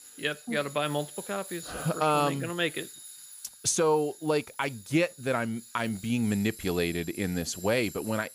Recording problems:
machinery noise; noticeable; throughout; 15 dB below the speech
high-pitched whine; faint; throughout; 10 kHz, 30 dB below the speech

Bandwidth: 15 kHz